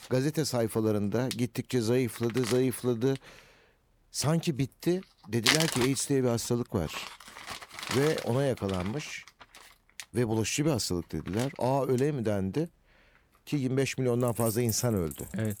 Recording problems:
household noises; loud; throughout; 6 dB below the speech

